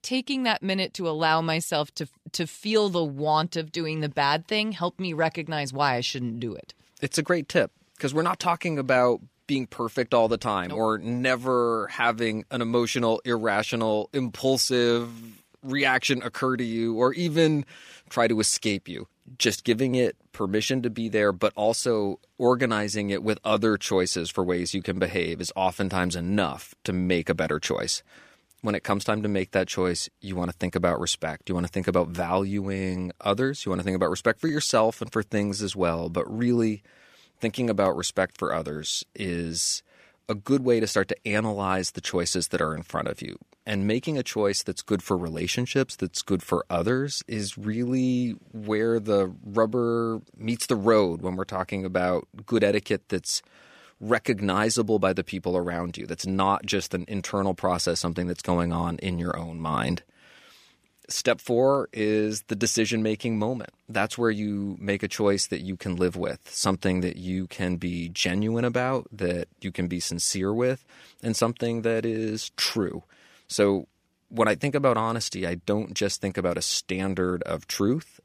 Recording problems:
none

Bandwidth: 15 kHz